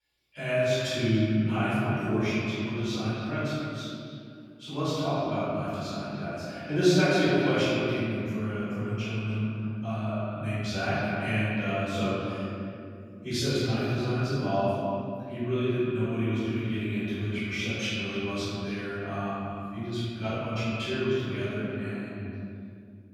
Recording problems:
room echo; strong; dies away in 2.7 s
off-mic speech; far
echo of what is said; noticeable; throughout; 290 ms later, 15 dB below the speech

